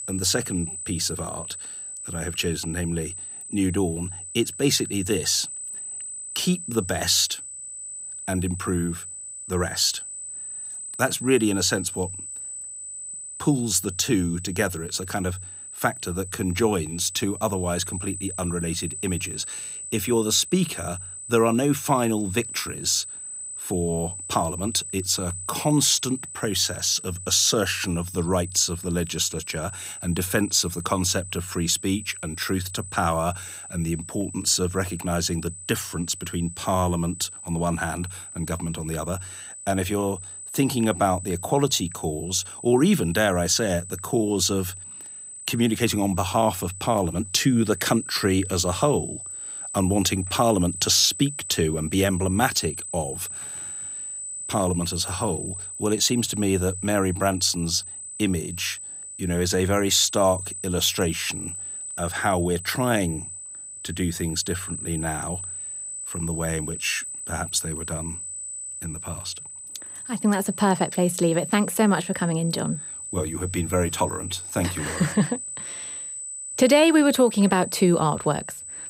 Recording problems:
high-pitched whine; loud; throughout; 8 kHz, 9 dB below the speech

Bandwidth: 15.5 kHz